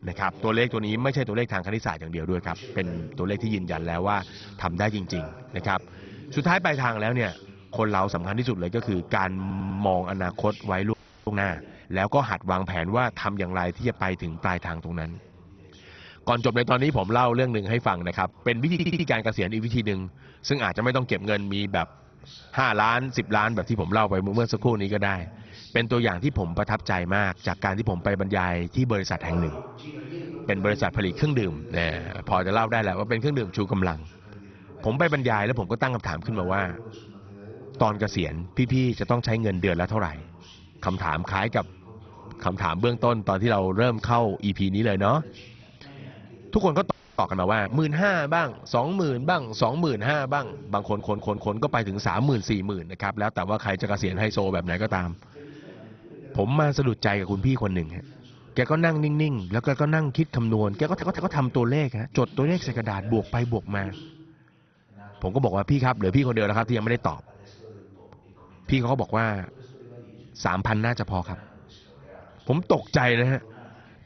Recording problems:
garbled, watery; badly; nothing above 6 kHz
voice in the background; noticeable; throughout; 20 dB below the speech
audio stuttering; 4 times, first at 9.5 s
audio freezing; at 11 s and at 47 s

